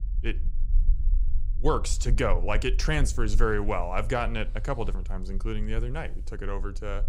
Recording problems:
low rumble; faint; throughout; 25 dB below the speech

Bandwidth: 15.5 kHz